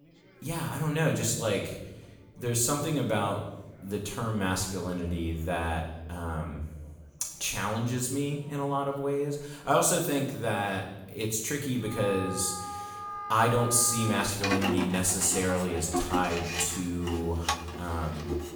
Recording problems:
off-mic speech; far
room echo; noticeable; dies away in 0.8 s
background music; loud; from 12 s on; 6 dB below the speech
chatter from many people; faint; throughout; 30 dB below the speech

